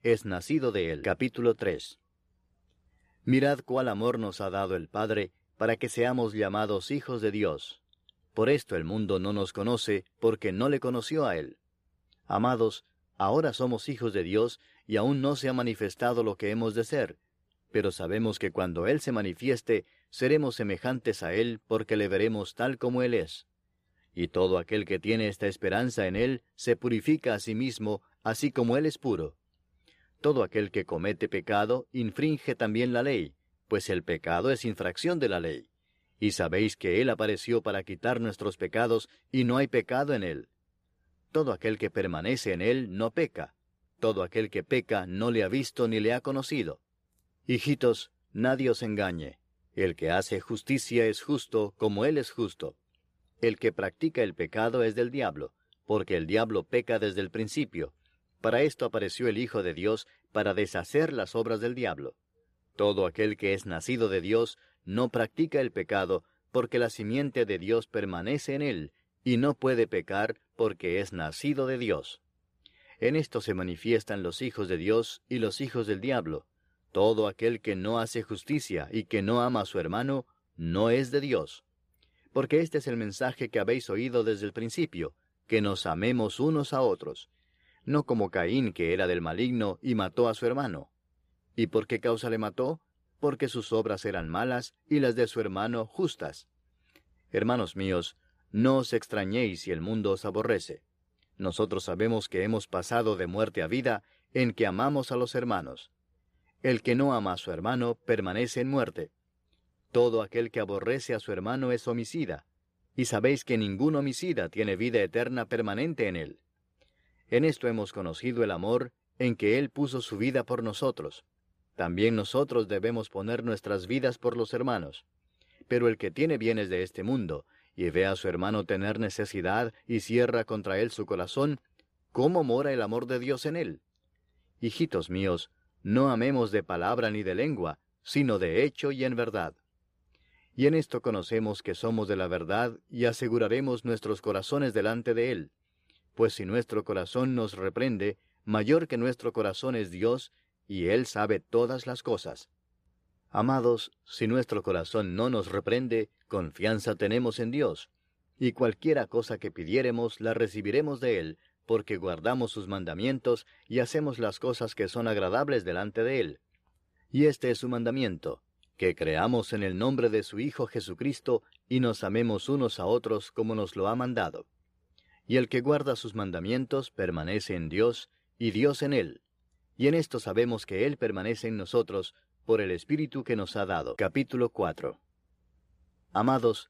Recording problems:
none

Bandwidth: 14.5 kHz